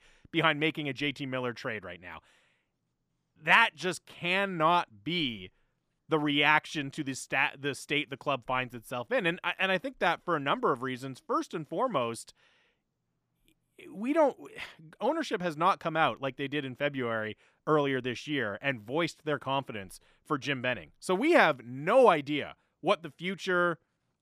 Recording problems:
none

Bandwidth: 14.5 kHz